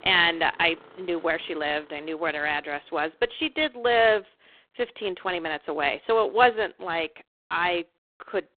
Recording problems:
phone-call audio; poor line
traffic noise; faint; throughout; 25 dB below the speech

